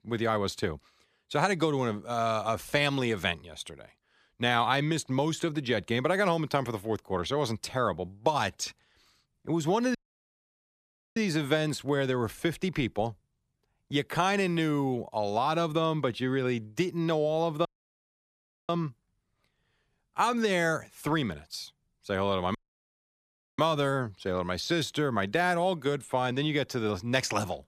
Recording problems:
audio cutting out; at 10 s for 1 s, at 18 s for 1 s and at 23 s for 1 s

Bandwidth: 14.5 kHz